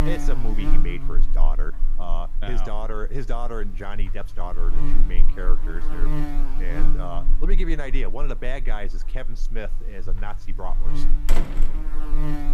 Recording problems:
electrical hum; loud; throughout; 50 Hz, 5 dB below the speech
door banging; loud; at 11 s; peak 3 dB above the speech

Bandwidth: 15 kHz